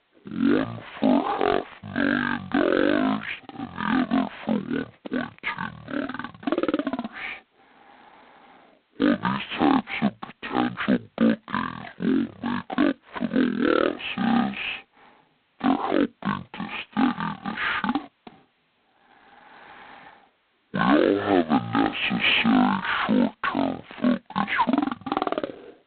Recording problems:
phone-call audio; poor line; nothing above 4 kHz
wrong speed and pitch; too slow and too low; 0.5 times normal speed

